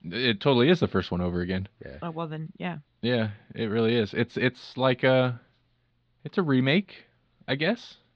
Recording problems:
muffled; slightly; fading above 4 kHz

